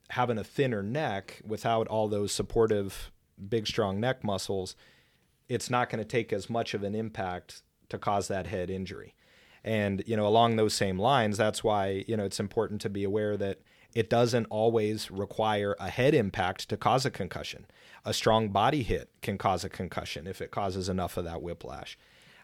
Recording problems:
none

